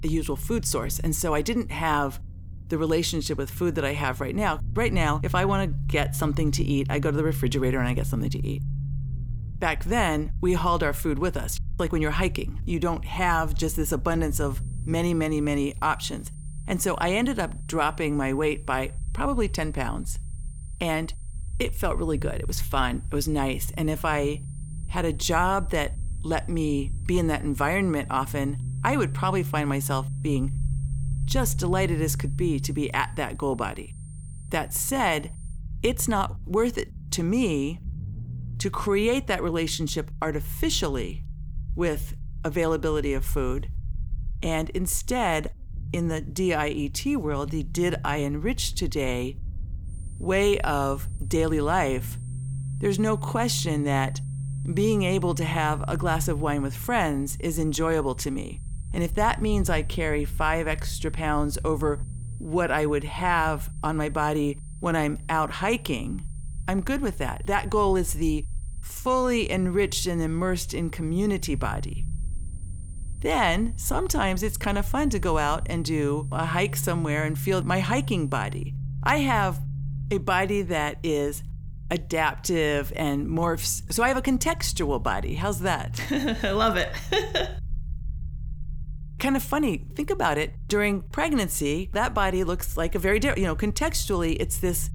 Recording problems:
high-pitched whine; faint; from 14 to 36 s and from 50 s to 1:19; 9 kHz, 25 dB below the speech
low rumble; faint; throughout; 20 dB below the speech

